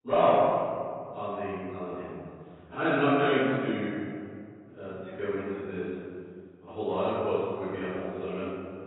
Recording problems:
room echo; strong; dies away in 2.3 s
off-mic speech; far
garbled, watery; badly; nothing above 4 kHz

